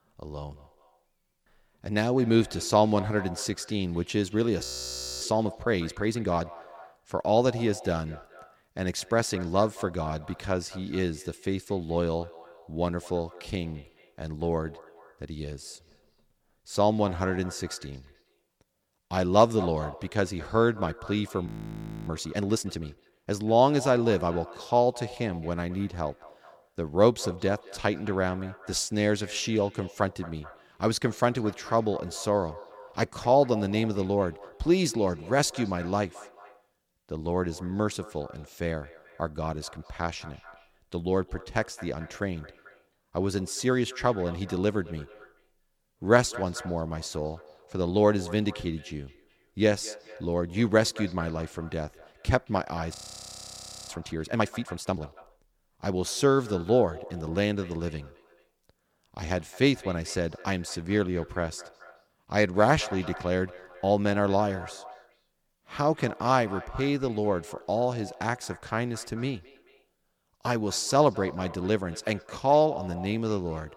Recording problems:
echo of what is said; faint; throughout; 220 ms later, 20 dB below the speech
audio freezing; at 4.5 s for 0.5 s, at 21 s for 0.5 s and at 53 s for 1 s

